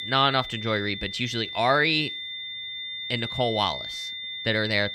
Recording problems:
high-pitched whine; loud; throughout; 3.5 kHz, 7 dB below the speech

